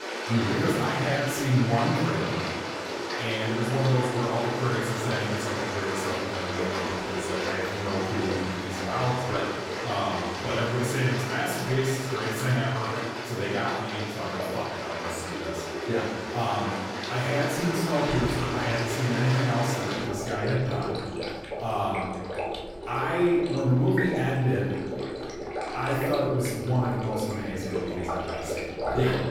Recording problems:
room echo; strong; dies away in 1.4 s
off-mic speech; far
rain or running water; loud; throughout; 4 dB below the speech

